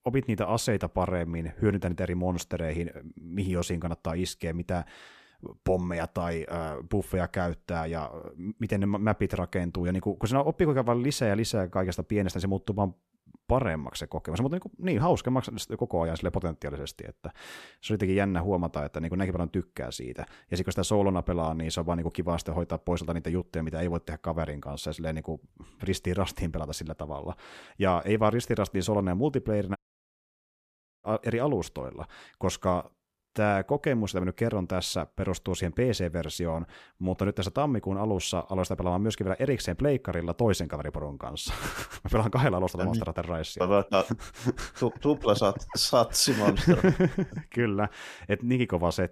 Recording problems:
audio cutting out; at 30 s for 1.5 s

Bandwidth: 14.5 kHz